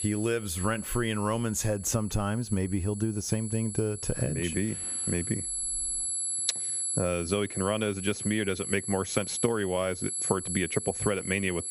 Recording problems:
squashed, flat; somewhat
high-pitched whine; loud; throughout; 11 kHz, 3 dB below the speech

